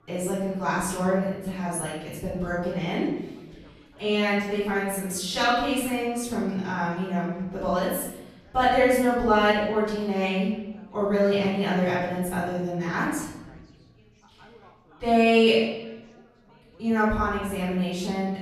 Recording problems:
room echo; strong; dies away in 0.9 s
off-mic speech; far
background chatter; faint; throughout; 4 voices, 30 dB below the speech

